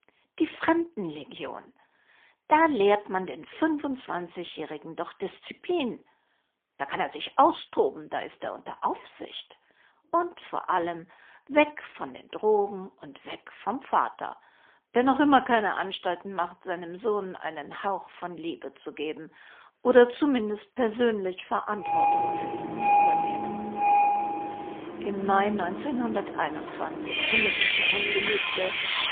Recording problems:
phone-call audio; poor line; nothing above 3.5 kHz
traffic noise; very loud; from 22 s on; 2 dB above the speech

